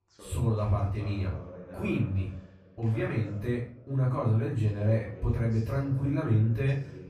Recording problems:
off-mic speech; far
room echo; slight; dies away in 0.4 s
voice in the background; noticeable; throughout; 20 dB below the speech

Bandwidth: 14.5 kHz